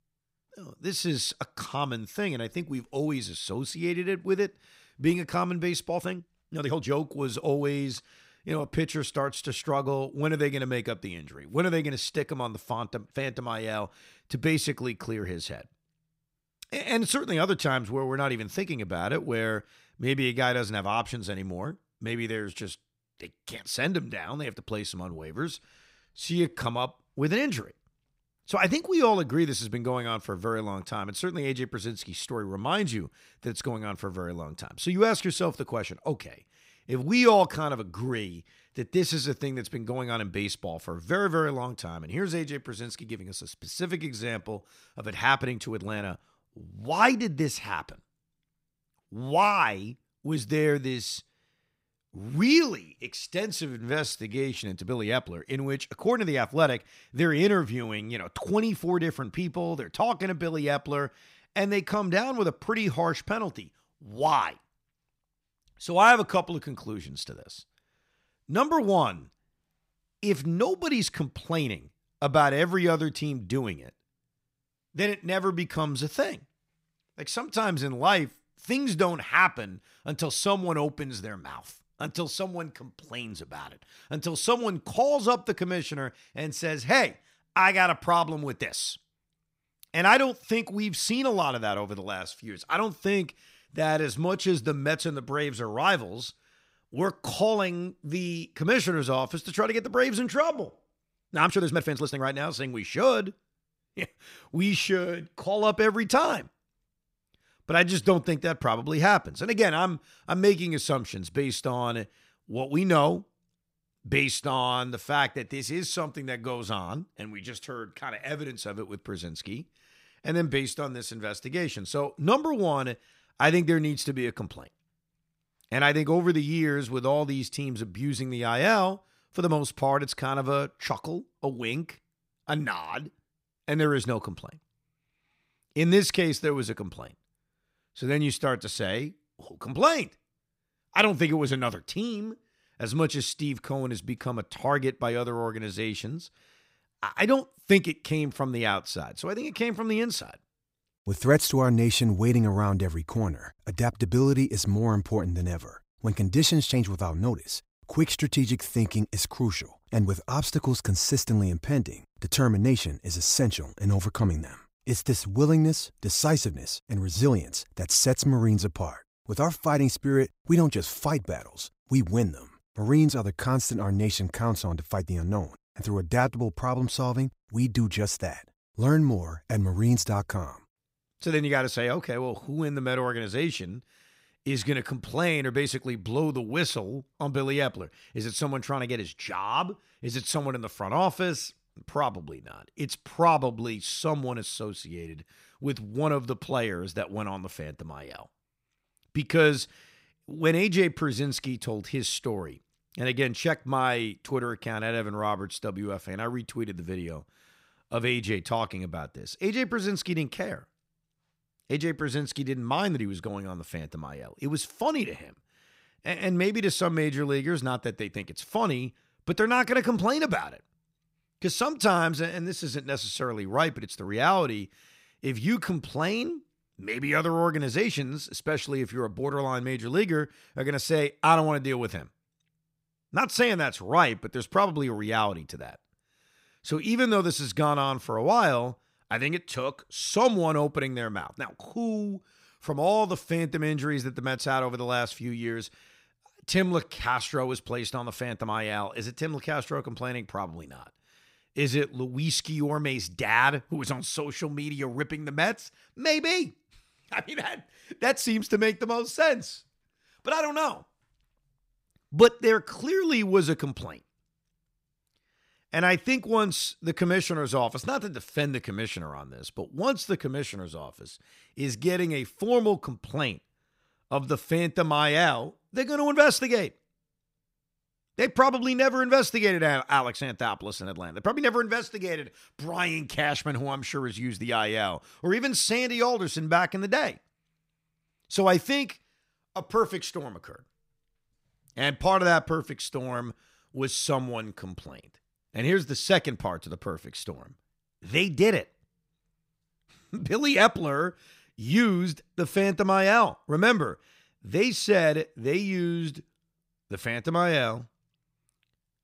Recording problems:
uneven, jittery; strongly; from 6 s to 4:07

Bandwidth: 15.5 kHz